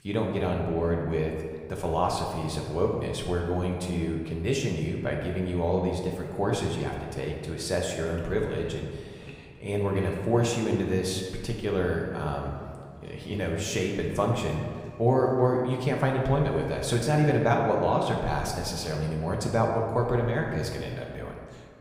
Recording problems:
room echo; noticeable; dies away in 1.5 s
off-mic speech; somewhat distant

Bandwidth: 15.5 kHz